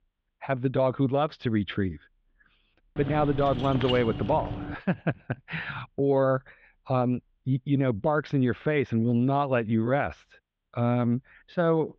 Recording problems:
muffled; very; fading above 3.5 kHz
jangling keys; noticeable; from 3 to 5 s; peak 6 dB below the speech

